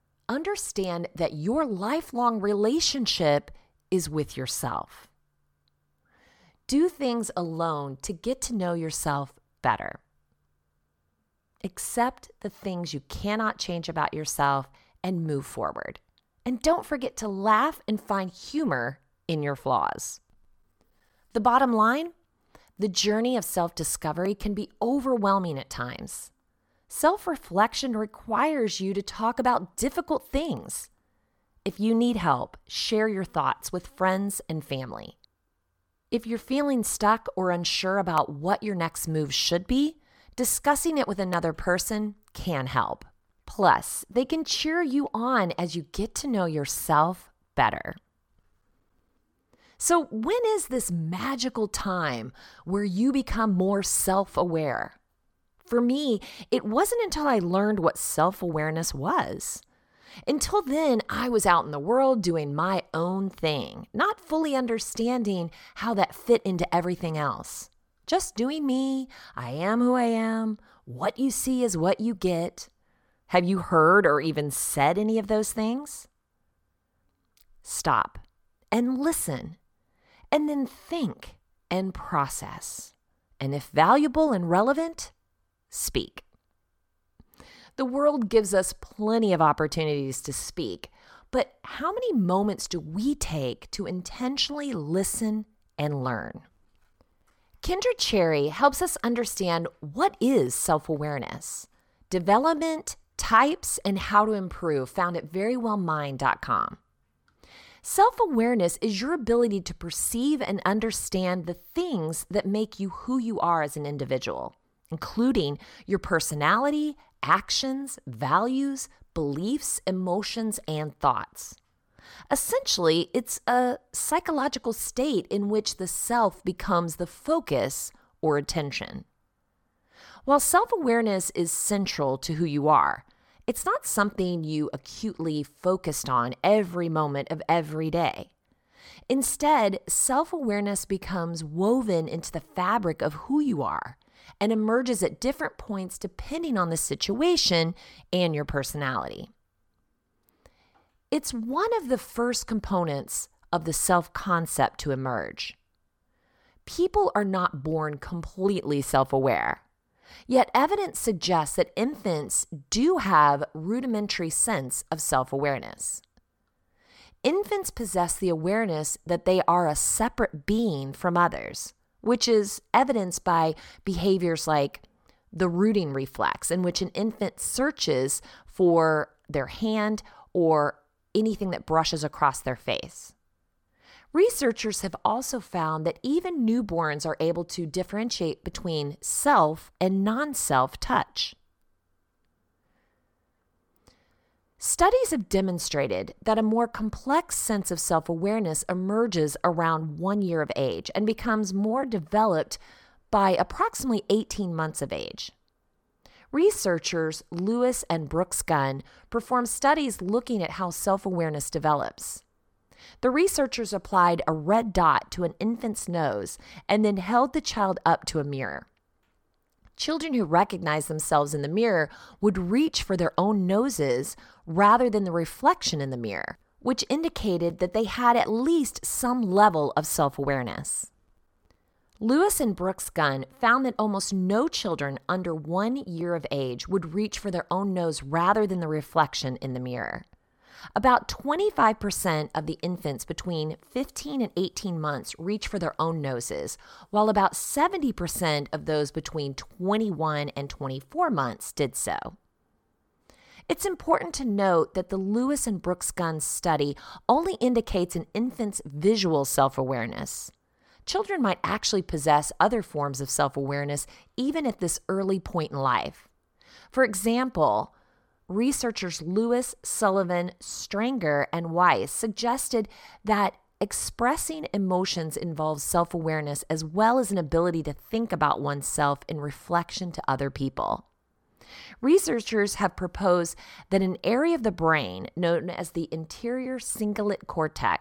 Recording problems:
none

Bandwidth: 18 kHz